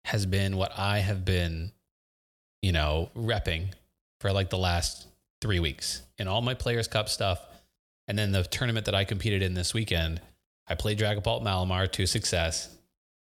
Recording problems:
none

